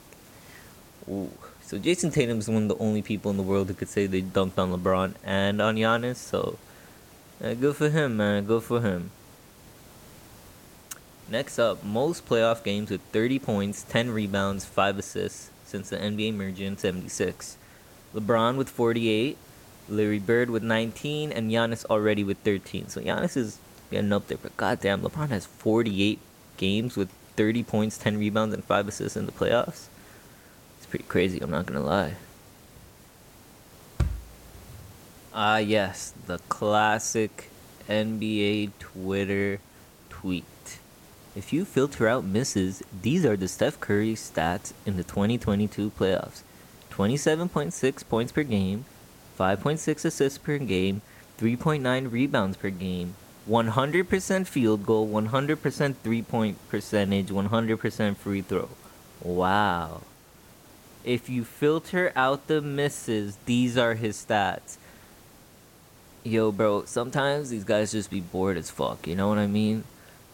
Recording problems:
hiss; faint; throughout; 25 dB below the speech

